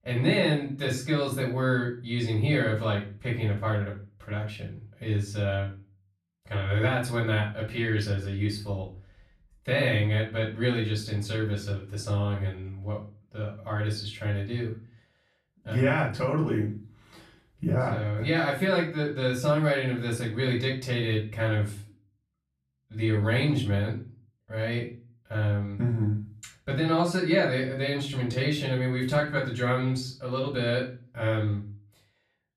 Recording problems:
off-mic speech; far
room echo; slight; dies away in 0.3 s

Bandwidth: 14 kHz